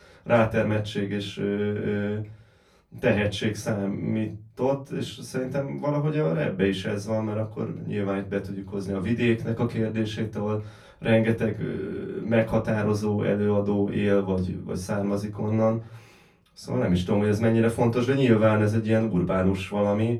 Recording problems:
off-mic speech; far
room echo; very slight; dies away in 0.3 s

